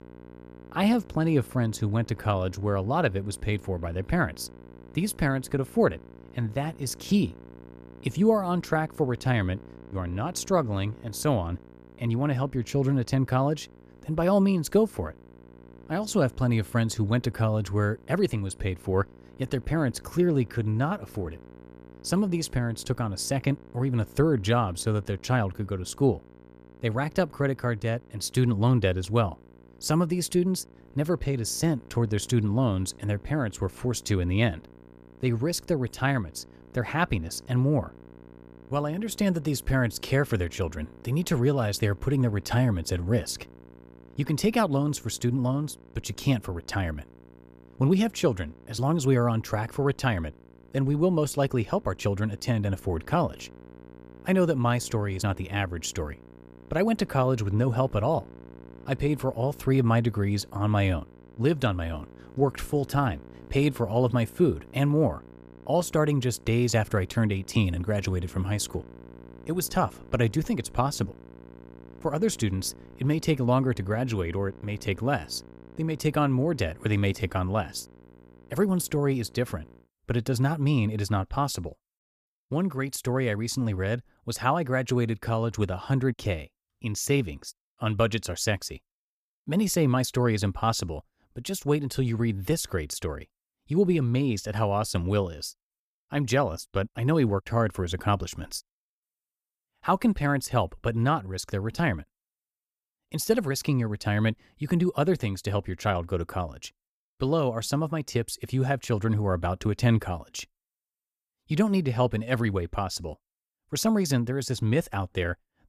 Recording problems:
electrical hum; faint; until 1:20; 60 Hz, 25 dB below the speech

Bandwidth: 14.5 kHz